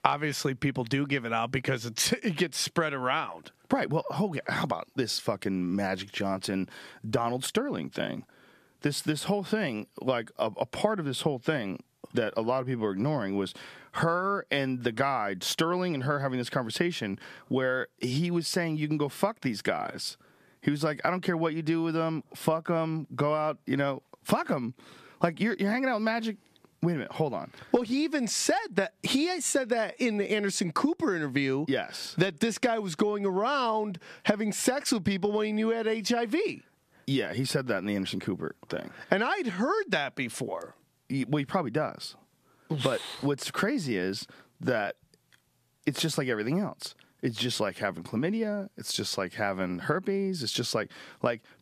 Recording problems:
squashed, flat; heavily

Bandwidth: 14.5 kHz